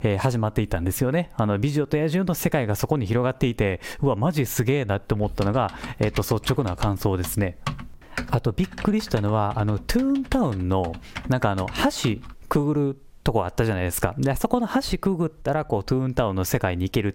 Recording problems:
squashed, flat; somewhat
keyboard typing; noticeable; from 5 to 12 s; peak 8 dB below the speech

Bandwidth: 16 kHz